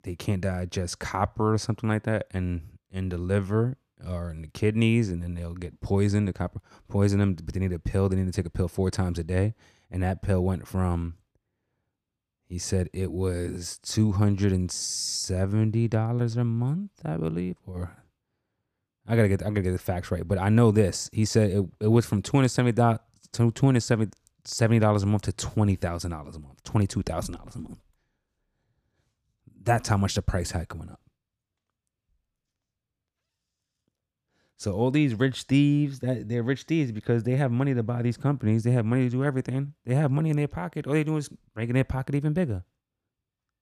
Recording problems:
none

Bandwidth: 14.5 kHz